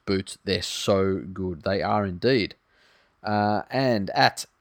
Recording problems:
none

